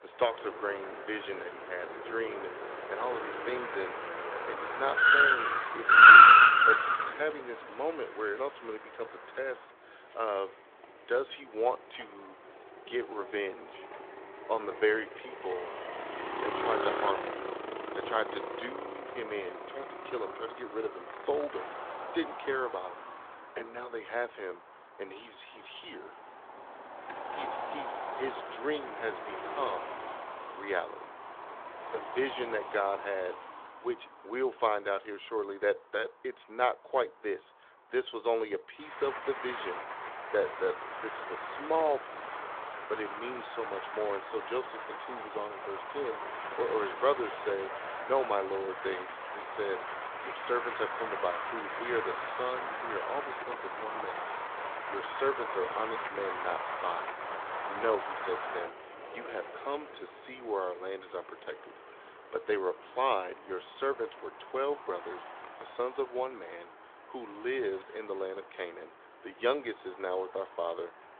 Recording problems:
phone-call audio; nothing above 3.5 kHz
traffic noise; very loud; throughout; 8 dB above the speech

